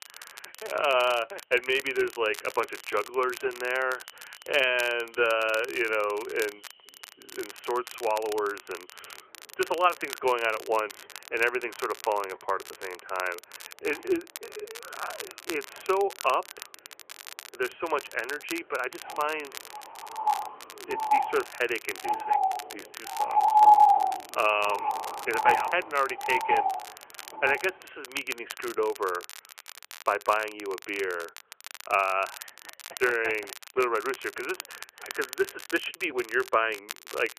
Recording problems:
phone-call audio; nothing above 3 kHz
animal sounds; very loud; until 28 s; 3 dB above the speech
crackle, like an old record; noticeable; 15 dB below the speech

